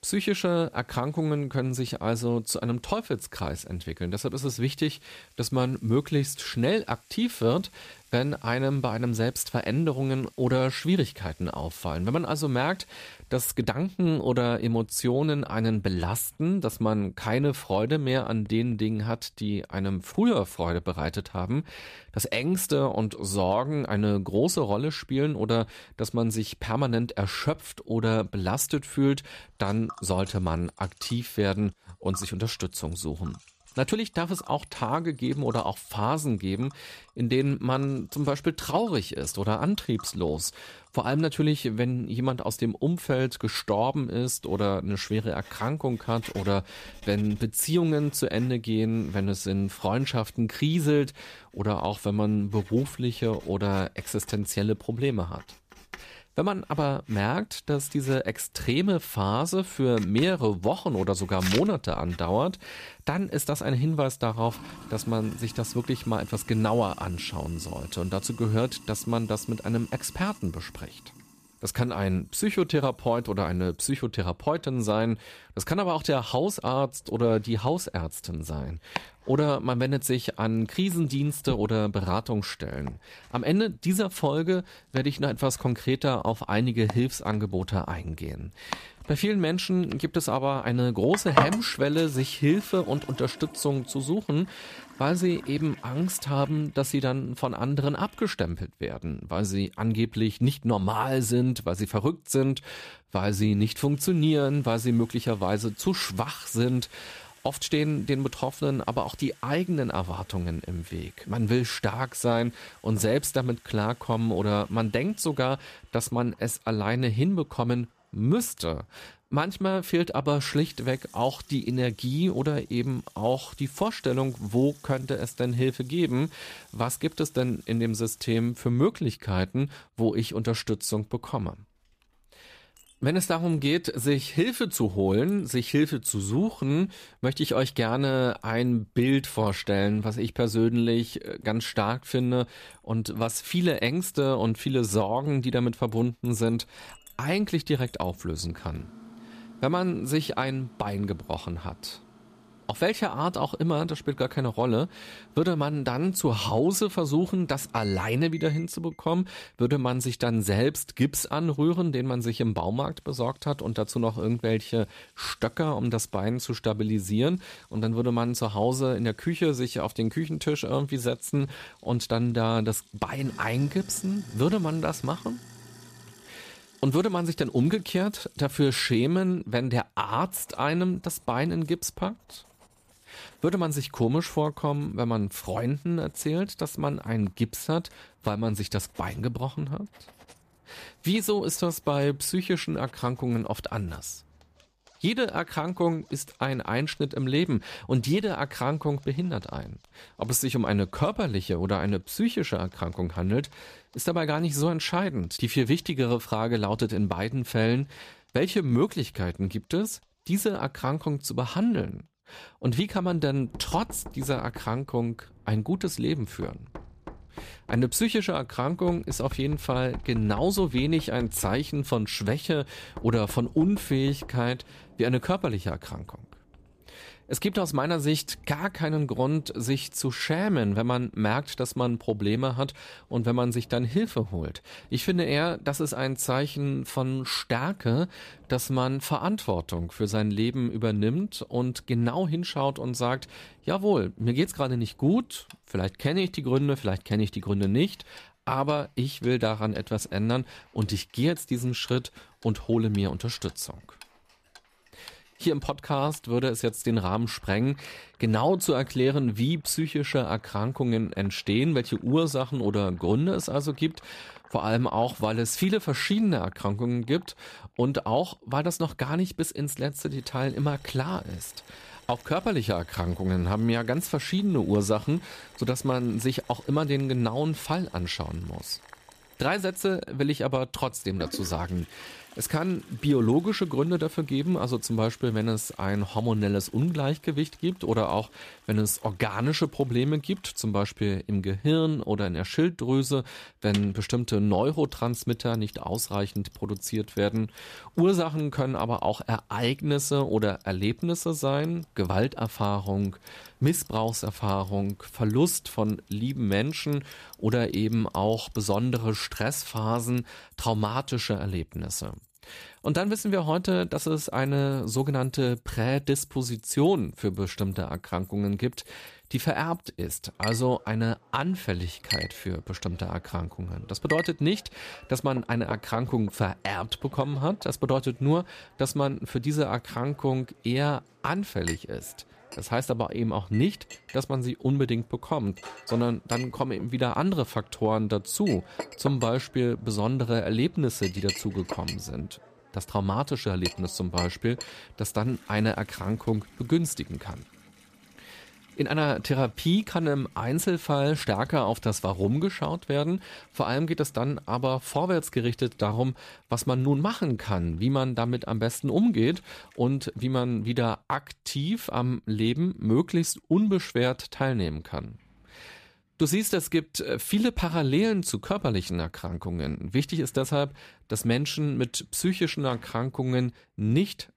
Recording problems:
household noises; noticeable; throughout; 15 dB below the speech

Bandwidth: 14.5 kHz